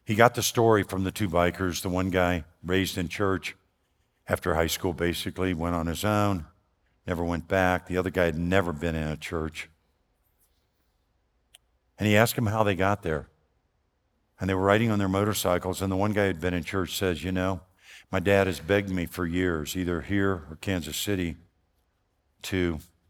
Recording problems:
none

